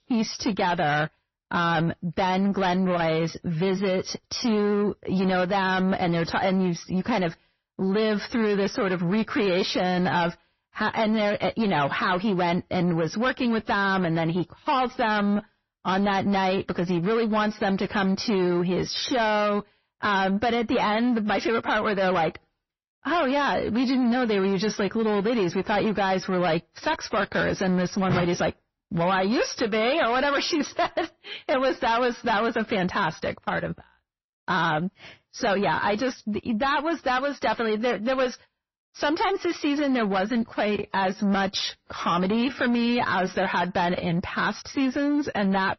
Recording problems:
distortion; slight; 10 dB below the speech
garbled, watery; slightly; nothing above 6 kHz

